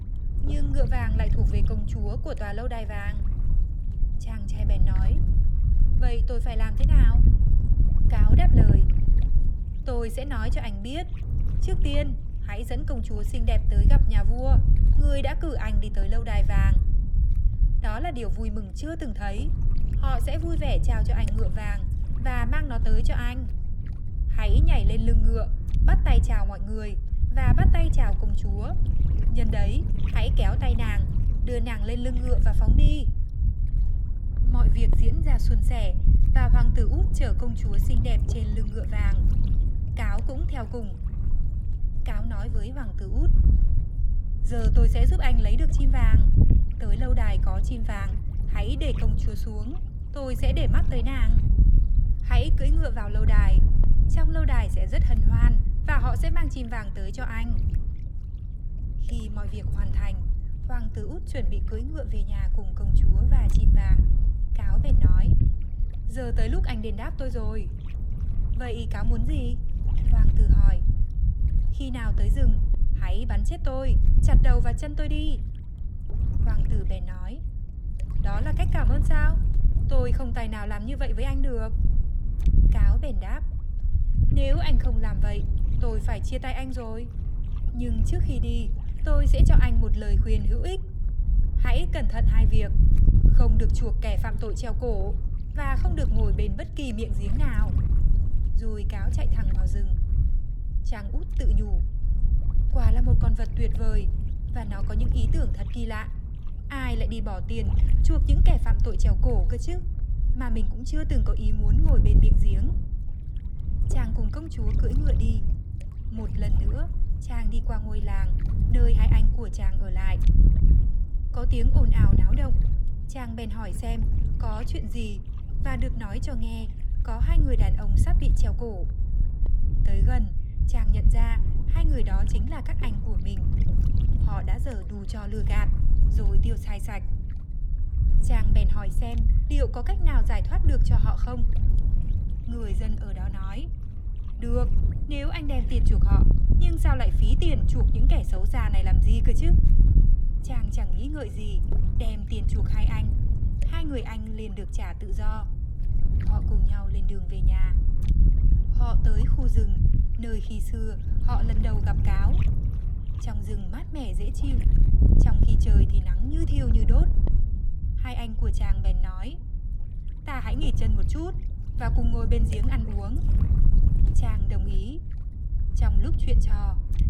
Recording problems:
wind noise on the microphone; heavy; 5 dB below the speech

